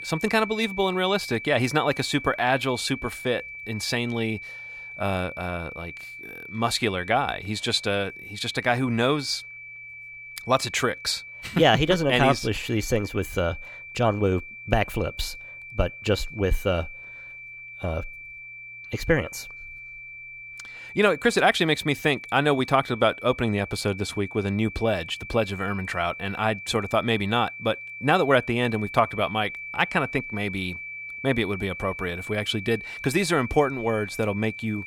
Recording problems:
high-pitched whine; noticeable; throughout; 2.5 kHz, 10 dB below the speech

